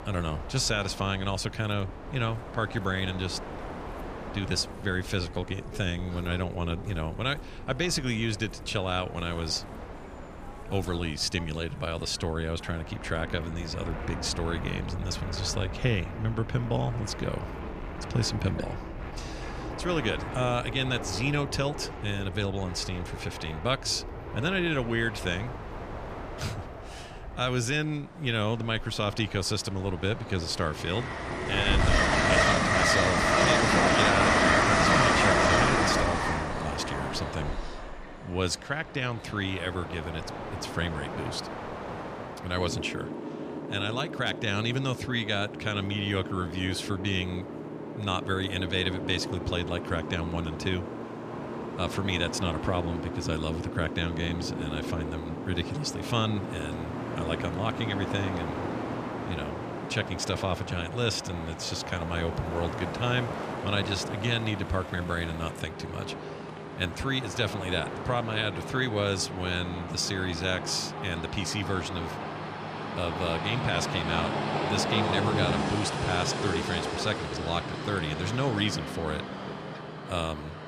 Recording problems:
train or aircraft noise; loud; throughout; 1 dB below the speech

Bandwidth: 14.5 kHz